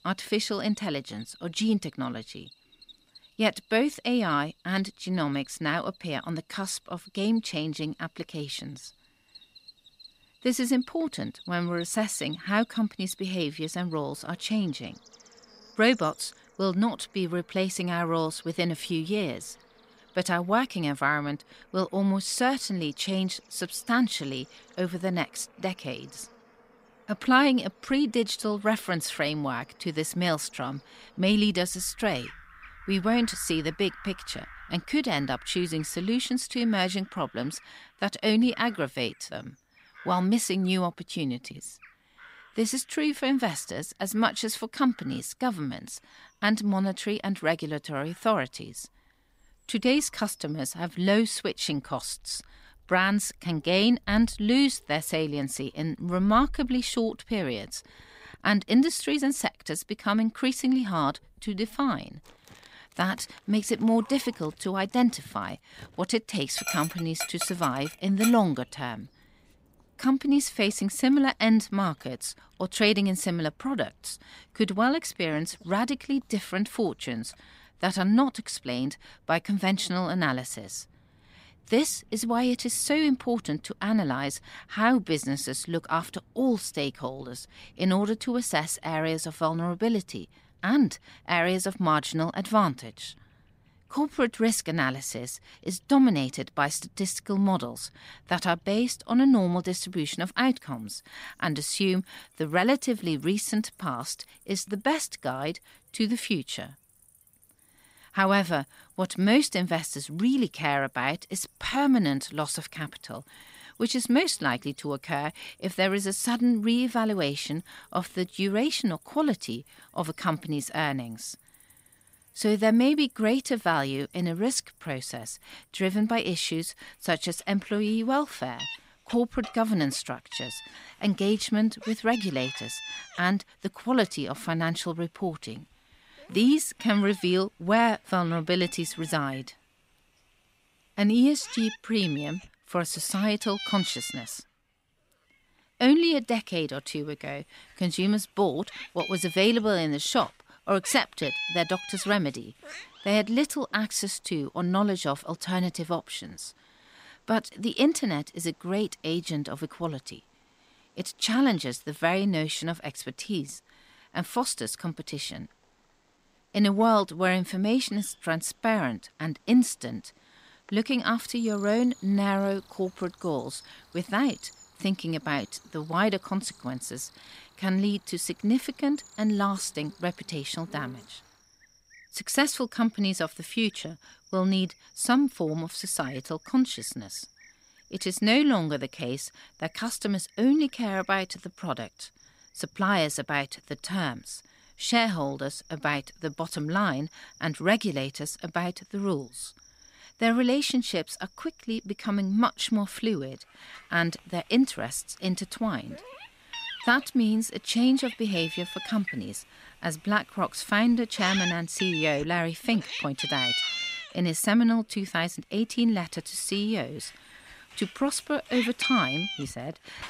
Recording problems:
animal sounds; noticeable; throughout; 10 dB below the speech

